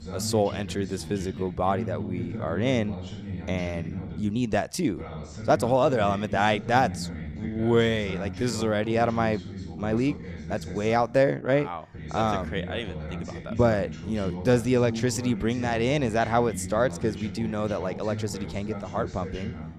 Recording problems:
voice in the background; loud; throughout; 10 dB below the speech
uneven, jittery; strongly; from 1 to 18 s

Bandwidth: 15 kHz